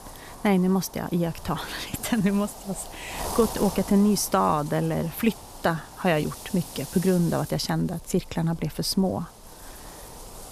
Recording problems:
wind noise on the microphone; occasional gusts; 10 dB below the speech

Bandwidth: 14.5 kHz